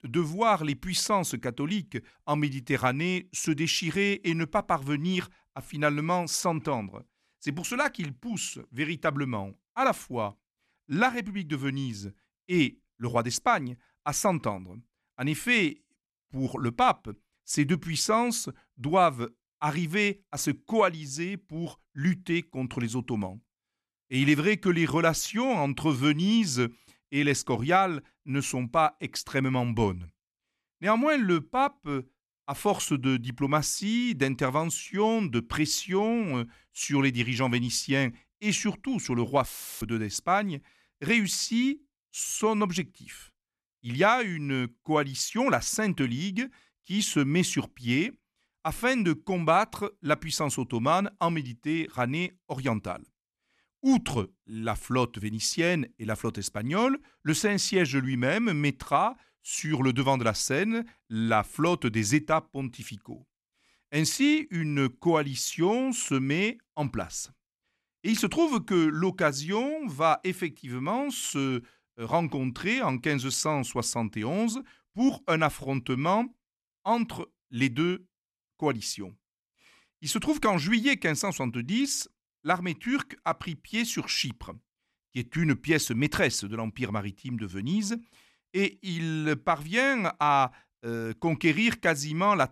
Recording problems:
audio cutting out; filled with static; at 39 s

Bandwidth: 13.5 kHz